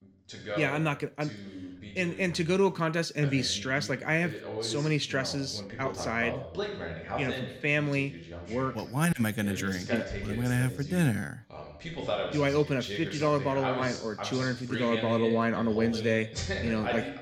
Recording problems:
voice in the background; loud; throughout; 8 dB below the speech

